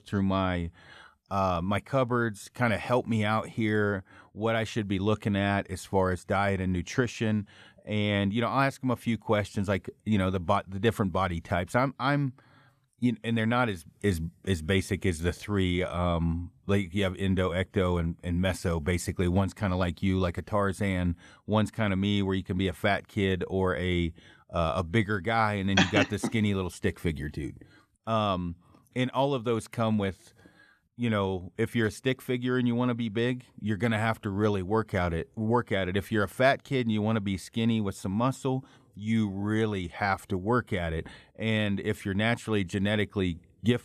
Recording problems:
none

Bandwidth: 14 kHz